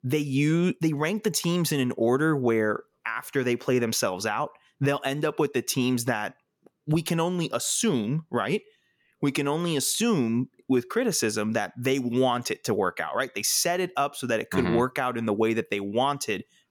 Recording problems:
none

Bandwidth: 18 kHz